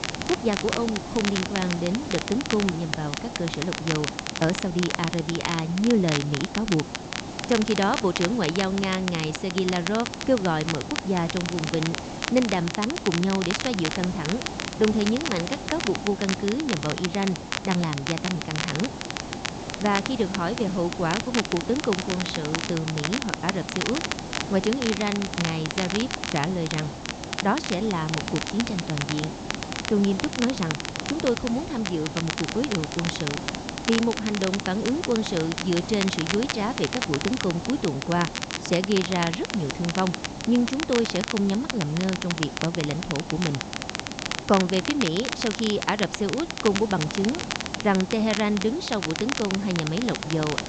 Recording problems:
high frequencies cut off; noticeable; nothing above 8 kHz
hiss; loud; throughout; 9 dB below the speech
crackle, like an old record; loud; 5 dB below the speech

